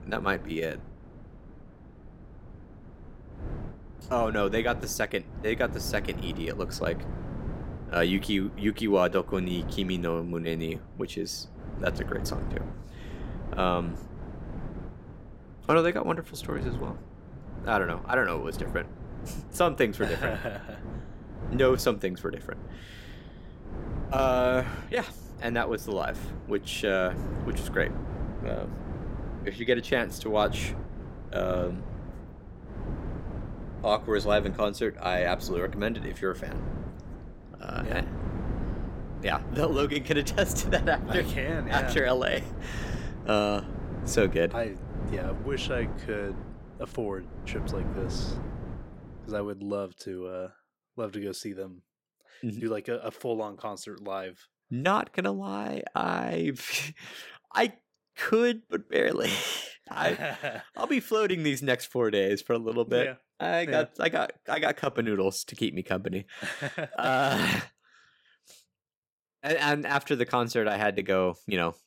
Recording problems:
wind noise on the microphone; occasional gusts; until 49 s; 15 dB below the speech

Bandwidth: 16.5 kHz